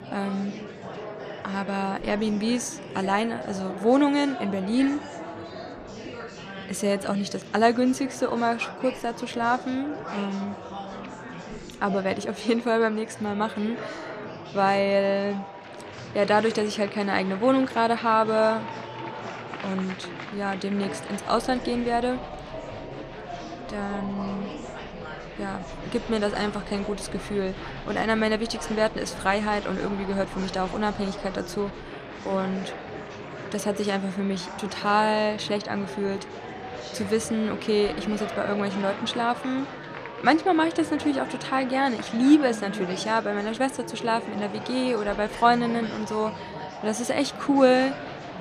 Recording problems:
echo of what is said; faint; throughout; 280 ms later, 20 dB below the speech
murmuring crowd; noticeable; throughout; 10 dB below the speech

